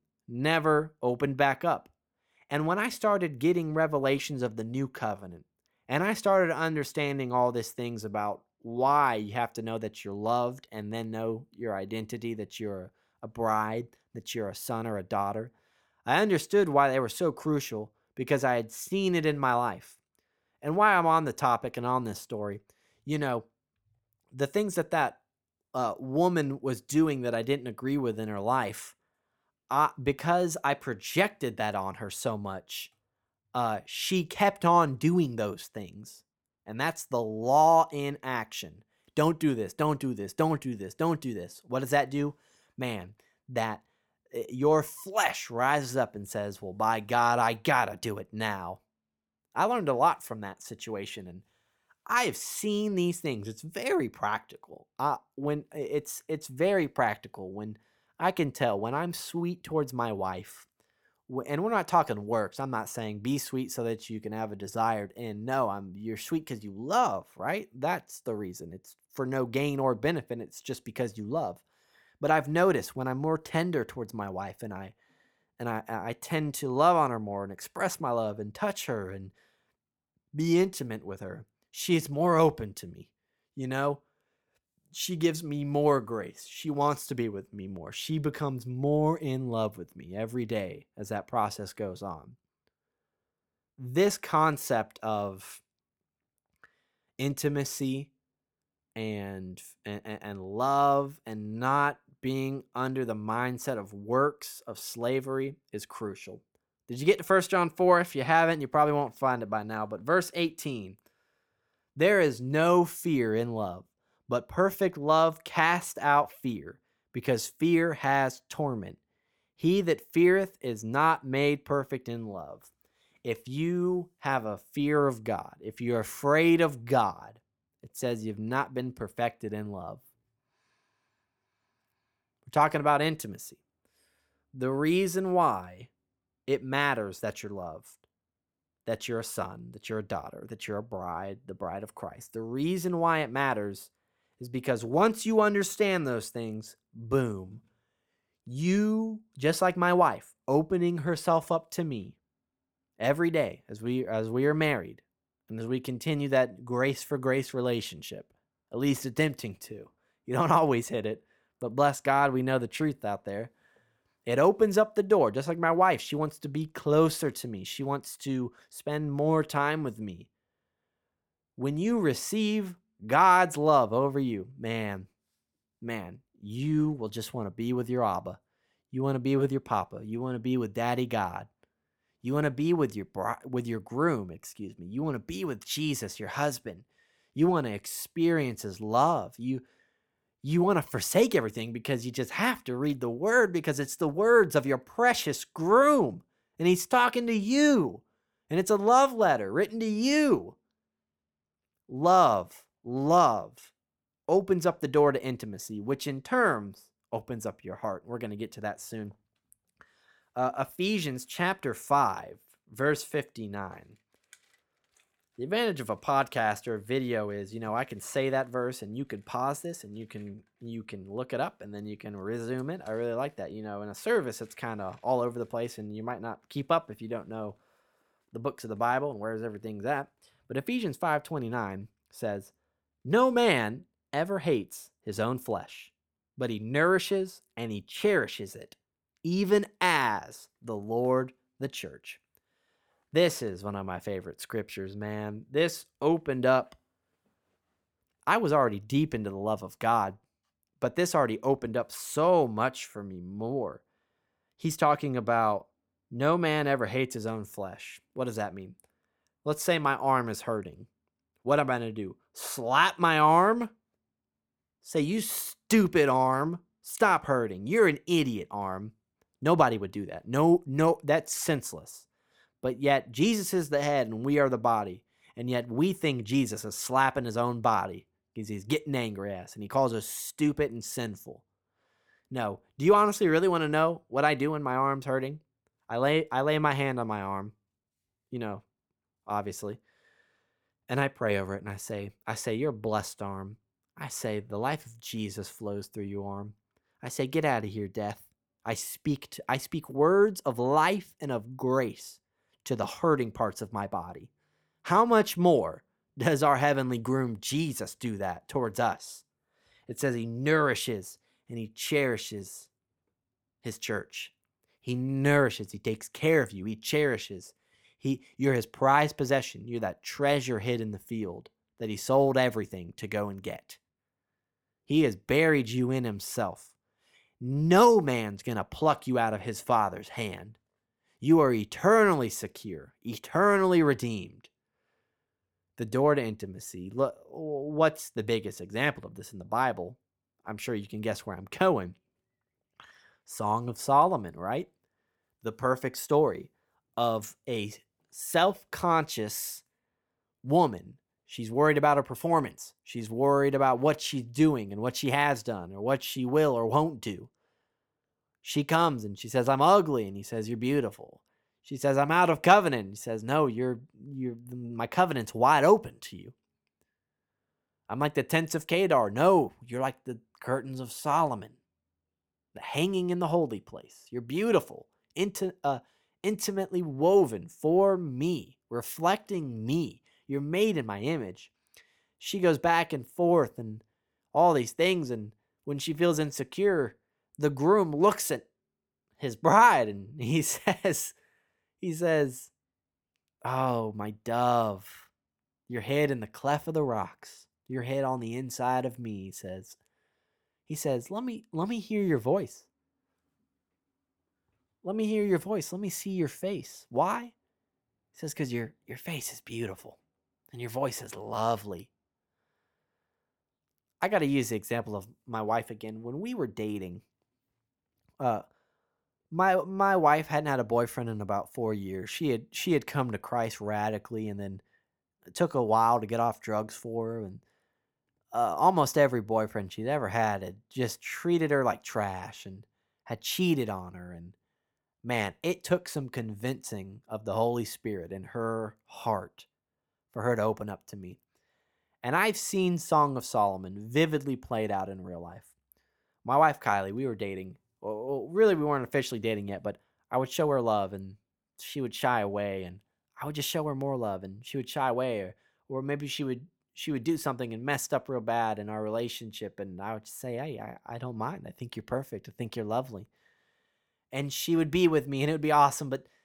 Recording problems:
none

